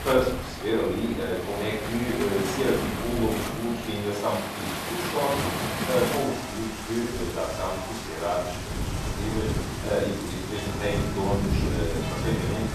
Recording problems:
off-mic speech; far
room echo; noticeable; dies away in 0.6 s
rain or running water; loud; throughout; 3 dB below the speech
wind noise on the microphone; occasional gusts; until 4 s and from 6 s on; 20 dB below the speech

